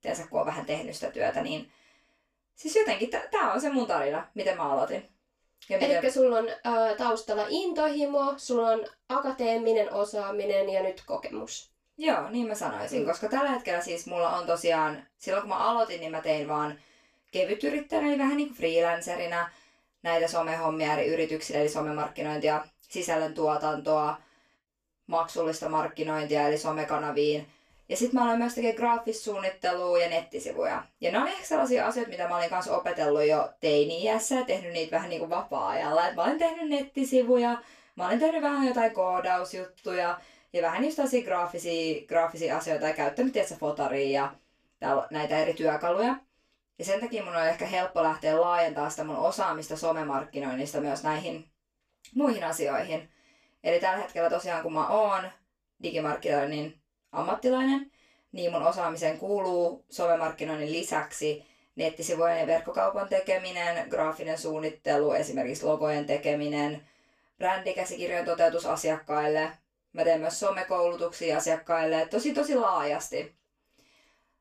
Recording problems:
off-mic speech; far
room echo; very slight; dies away in 0.2 s

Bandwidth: 14.5 kHz